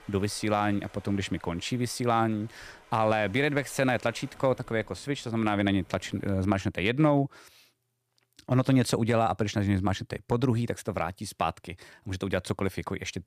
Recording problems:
rain or running water; faint; until 6.5 s; 25 dB below the speech

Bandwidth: 15 kHz